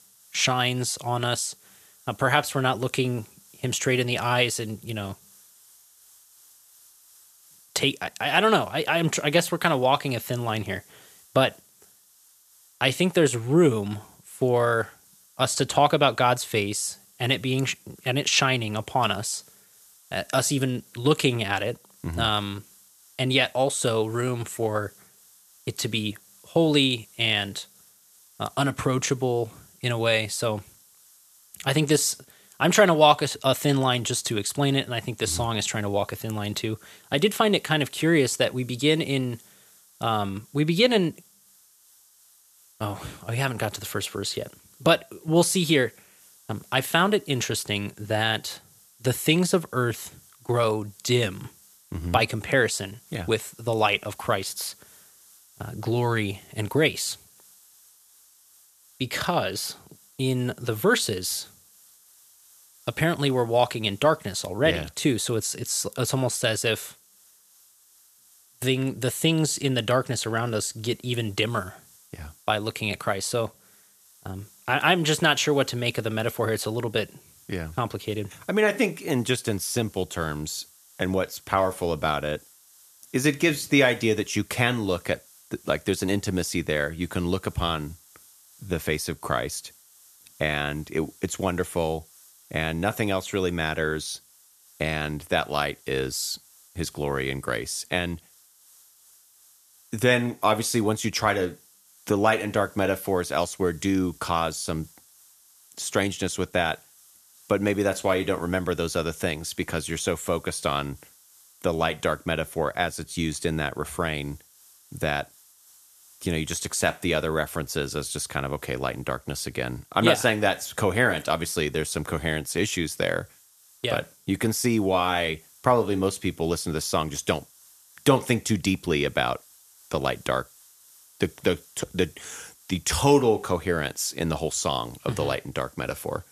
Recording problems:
hiss; faint; throughout; 25 dB below the speech

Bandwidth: 14 kHz